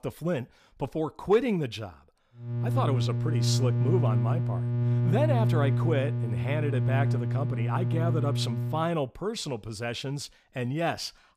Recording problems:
electrical hum; loud; from 2.5 to 9 s; 60 Hz, 6 dB below the speech

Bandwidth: 15 kHz